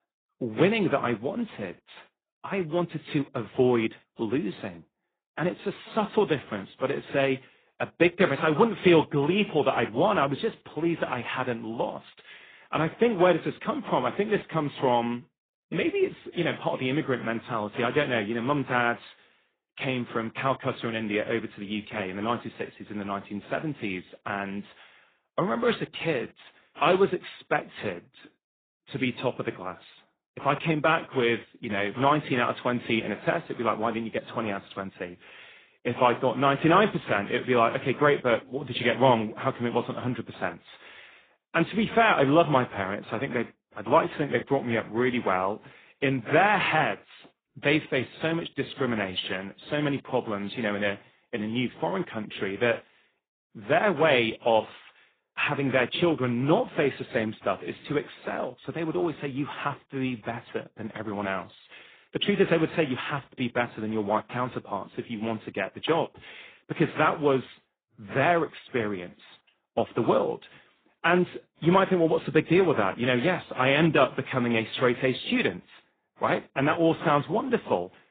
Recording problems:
garbled, watery; badly; nothing above 3.5 kHz
muffled; very slightly; fading above 4 kHz

